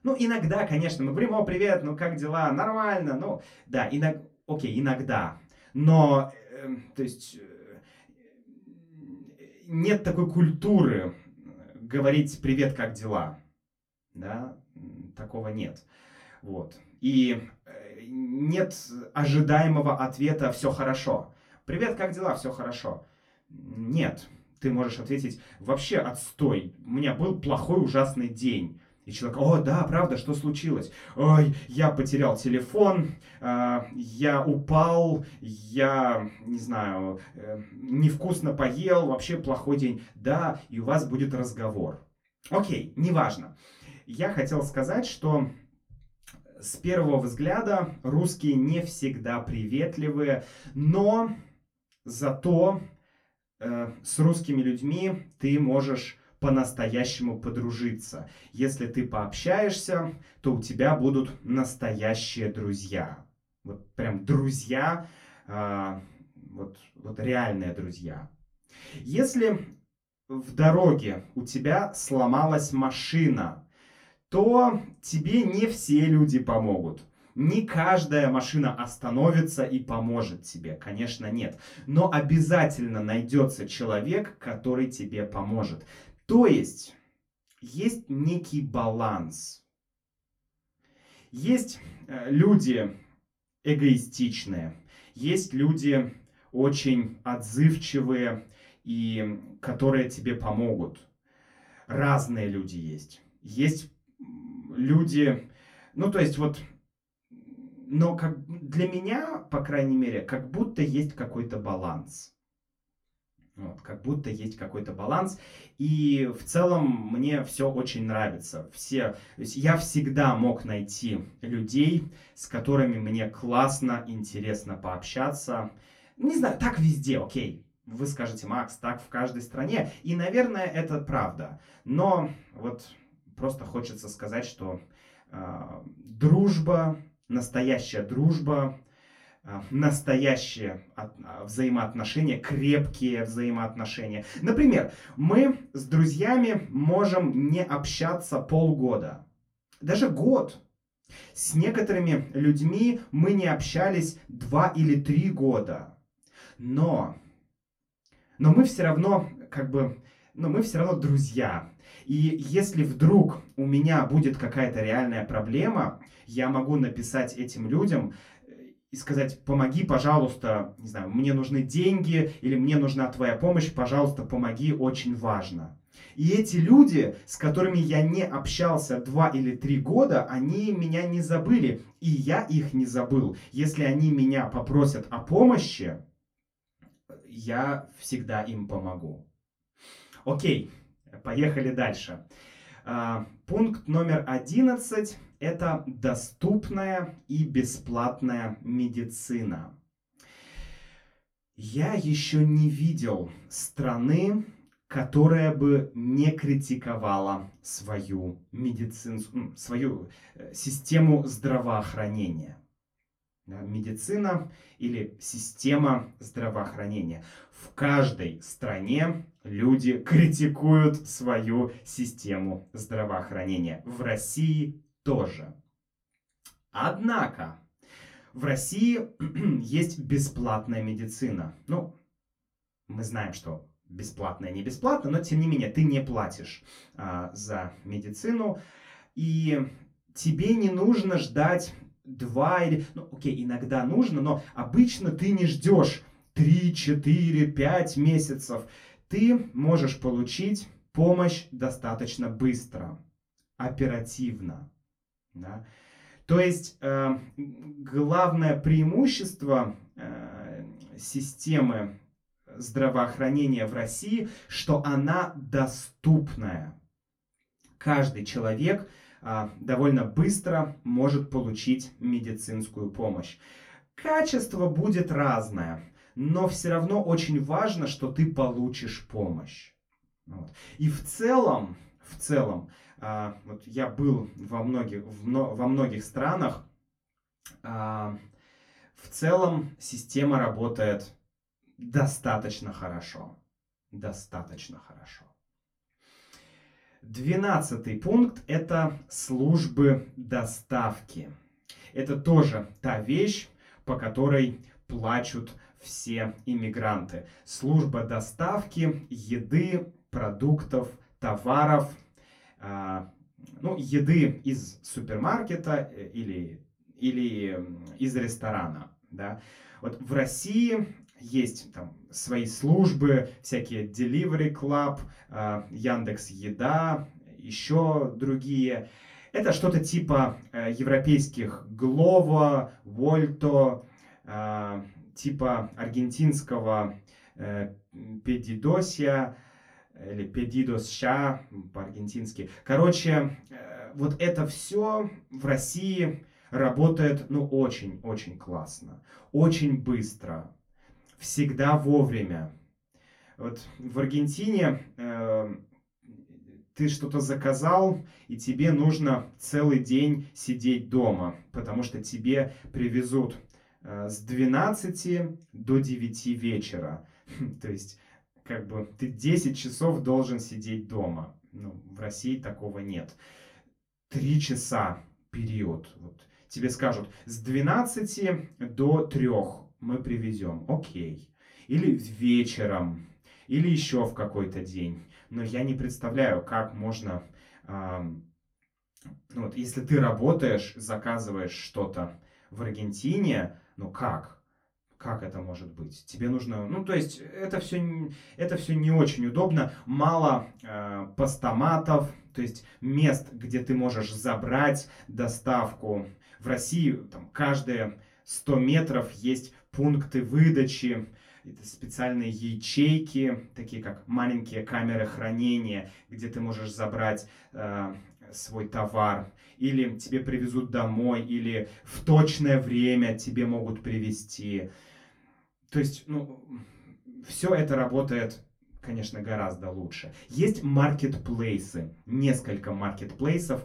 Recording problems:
off-mic speech; far
room echo; very slight; dies away in 0.2 s

